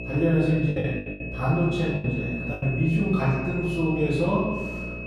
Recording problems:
room echo; strong; dies away in 1.2 s
off-mic speech; far
electrical hum; noticeable; throughout; 60 Hz, 15 dB below the speech
high-pitched whine; noticeable; throughout; 2.5 kHz, 10 dB below the speech
choppy; very; from 0.5 to 2.5 s; 13% of the speech affected

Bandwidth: 14.5 kHz